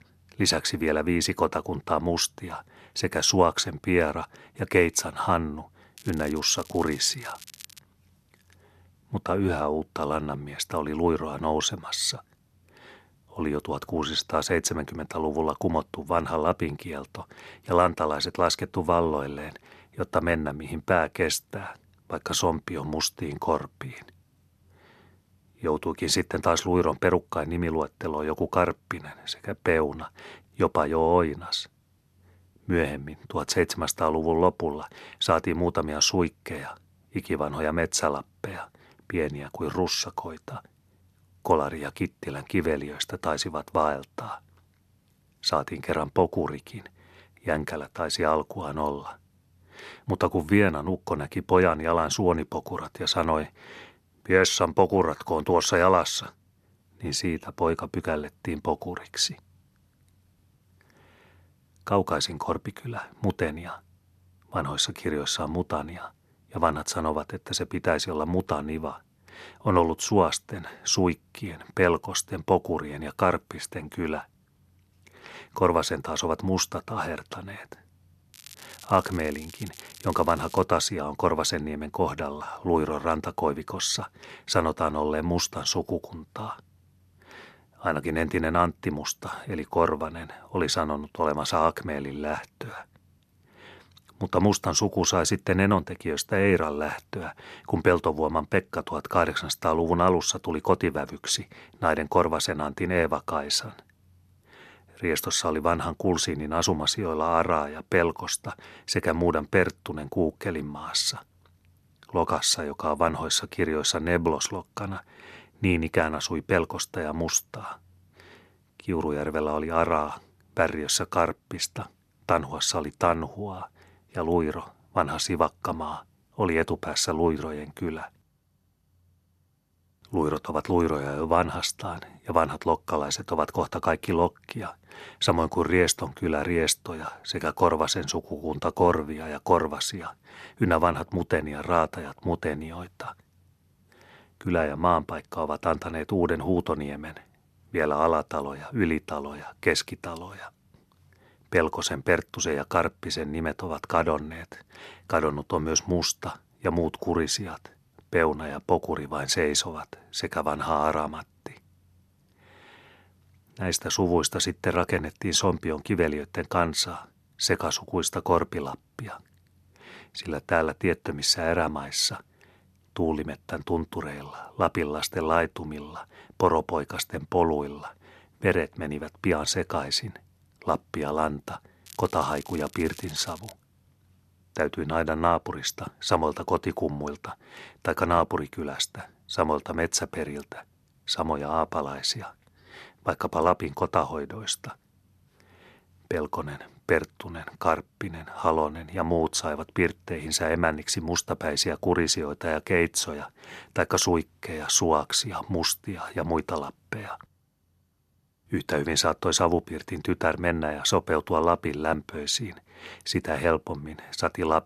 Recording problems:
crackling; noticeable; from 6 to 8 s, from 1:18 to 1:21 and from 3:02 to 3:04; 20 dB below the speech

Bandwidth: 13.5 kHz